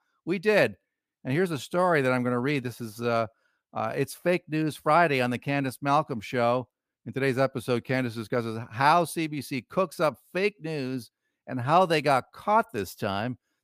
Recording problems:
none

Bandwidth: 15 kHz